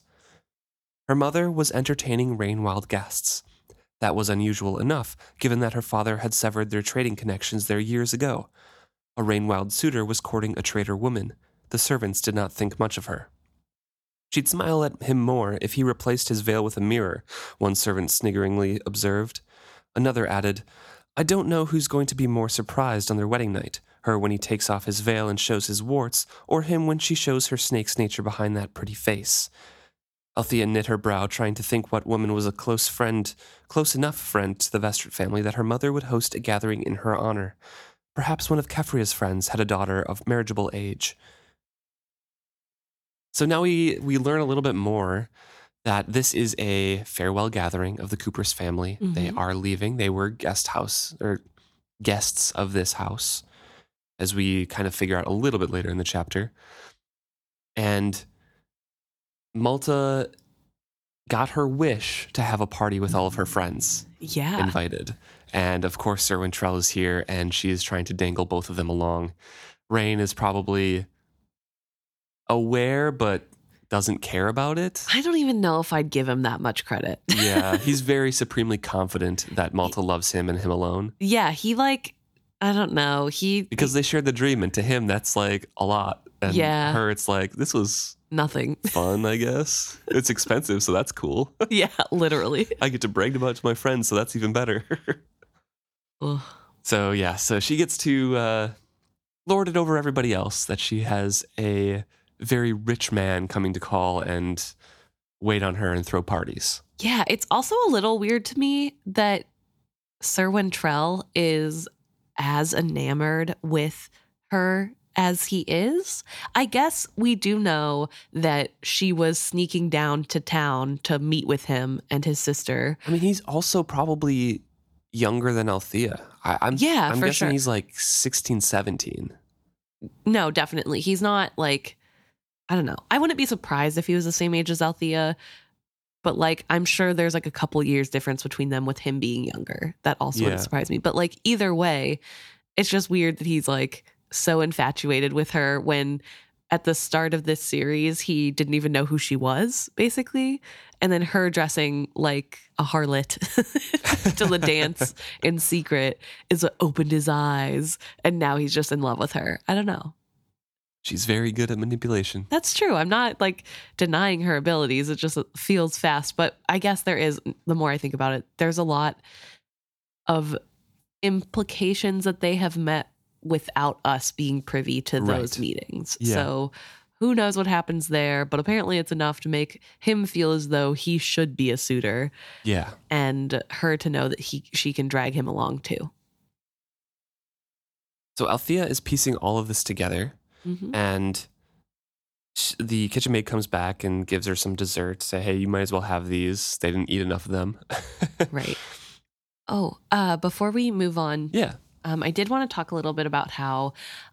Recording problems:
none

